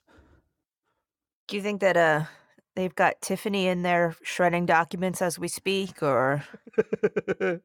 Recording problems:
none

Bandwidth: 17.5 kHz